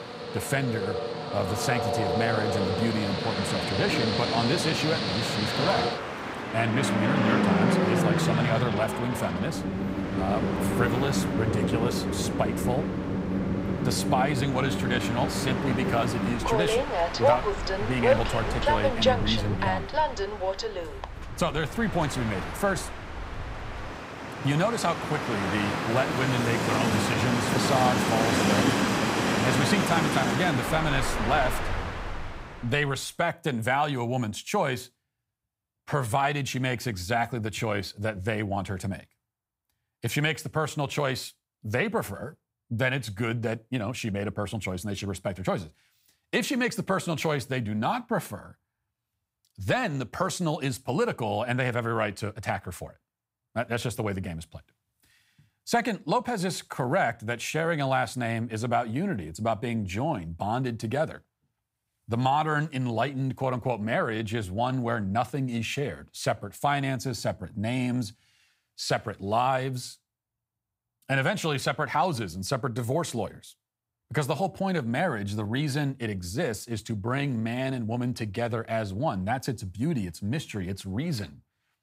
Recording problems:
train or aircraft noise; very loud; until 32 s; 1 dB above the speech

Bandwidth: 15.5 kHz